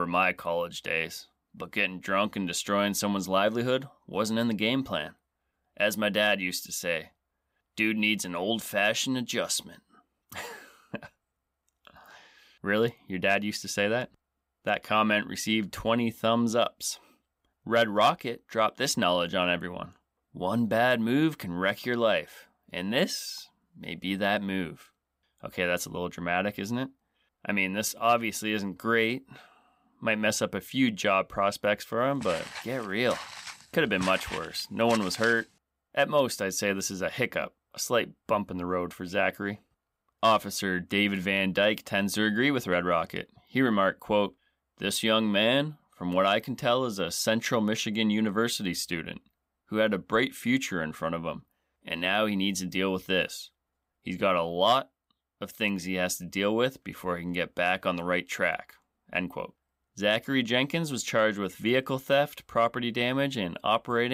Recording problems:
abrupt cut into speech; at the start and the end
footsteps; noticeable; from 32 to 35 s; peak 9 dB below the speech

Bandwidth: 15.5 kHz